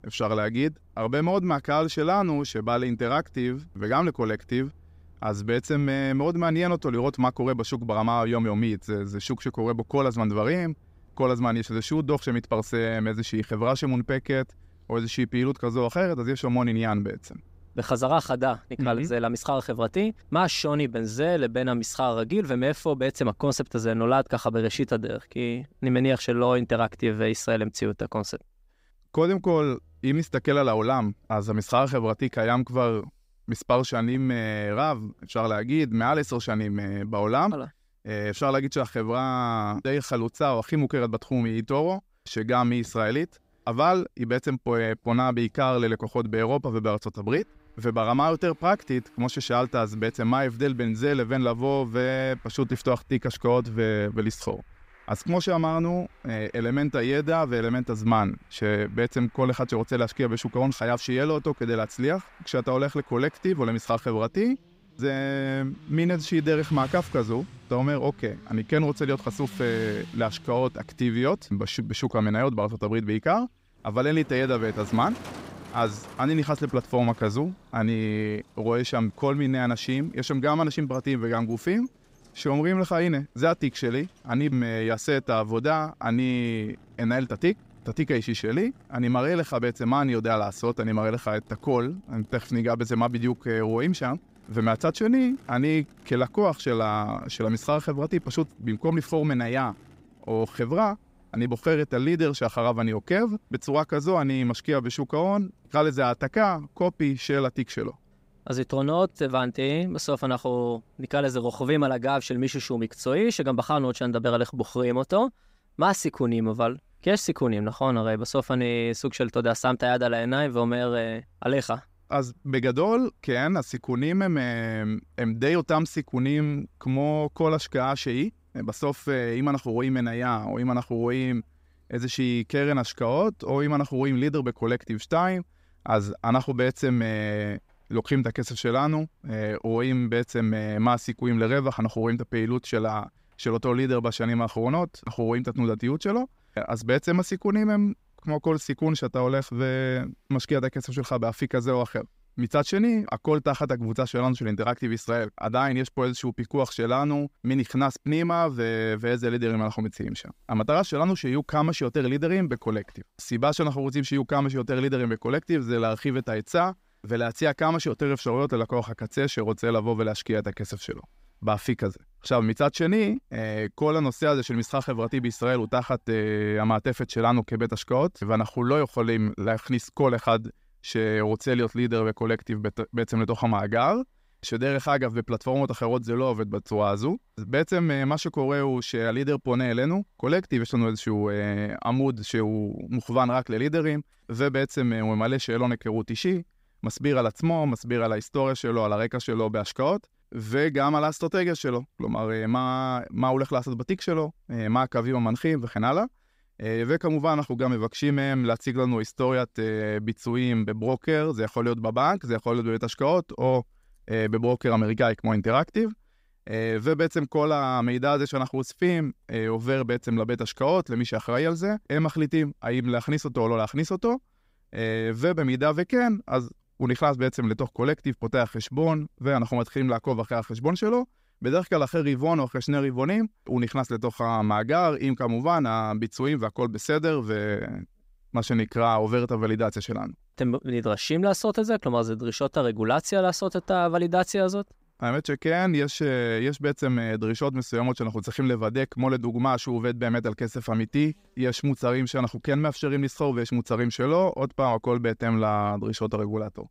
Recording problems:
traffic noise; faint; throughout; 25 dB below the speech

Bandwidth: 15.5 kHz